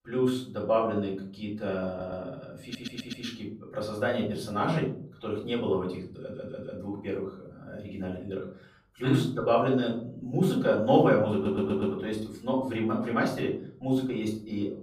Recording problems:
off-mic speech; far
room echo; slight; dies away in 0.5 s
audio stuttering; 4 times, first at 2 s

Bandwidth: 15 kHz